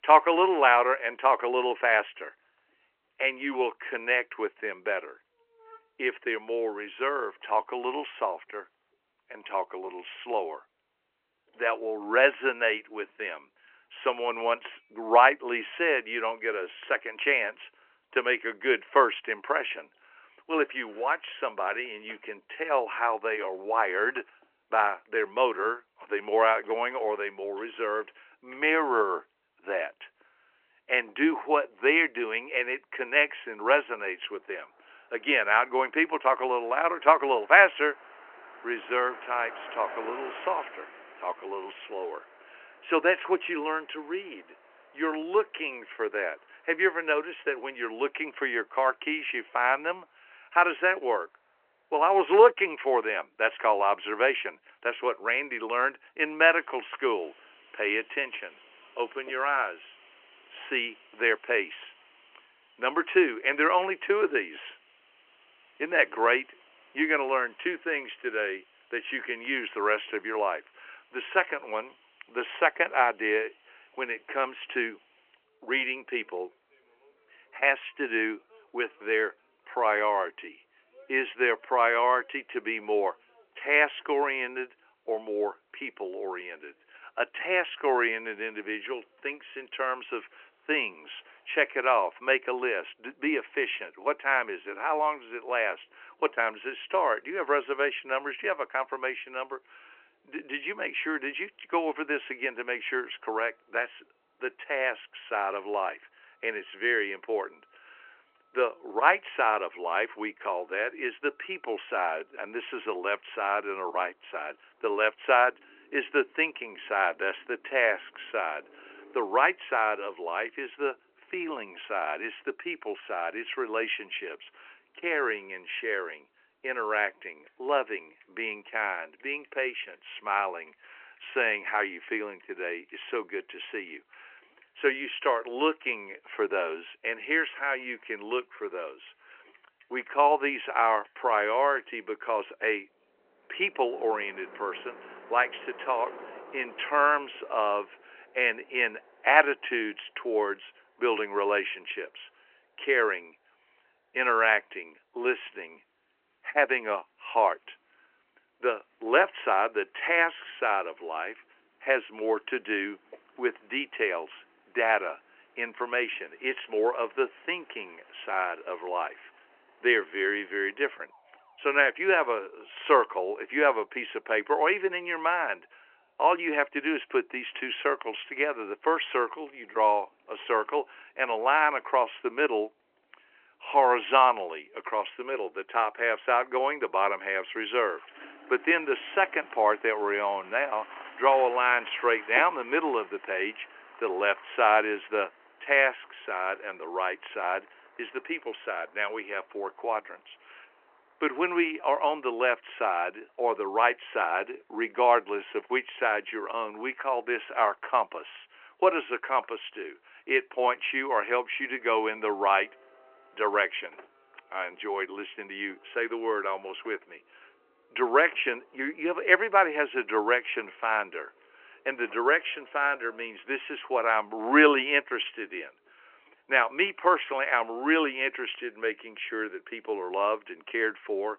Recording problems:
phone-call audio
traffic noise; faint; throughout; 25 dB below the speech

